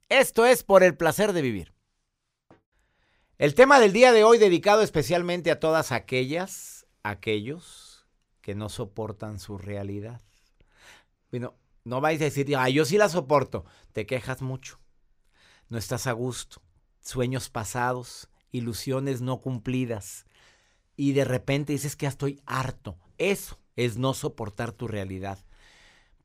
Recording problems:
none

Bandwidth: 15.5 kHz